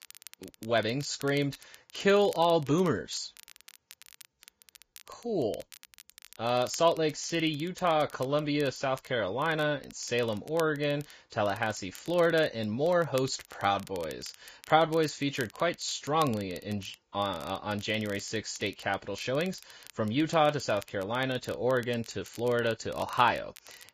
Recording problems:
garbled, watery; badly; nothing above 7.5 kHz
crackle, like an old record; faint; 20 dB below the speech

